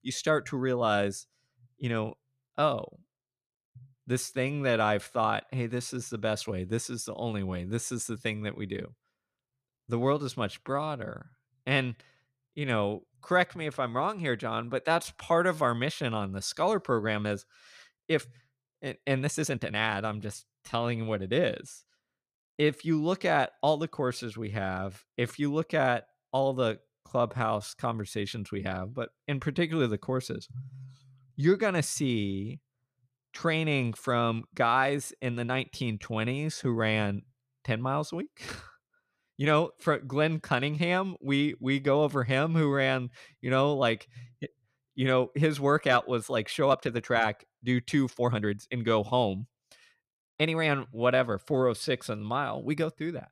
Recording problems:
uneven, jittery; strongly; from 11 to 51 s

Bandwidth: 14.5 kHz